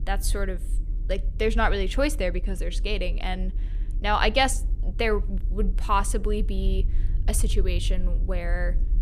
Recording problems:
low rumble; faint; throughout; 25 dB below the speech

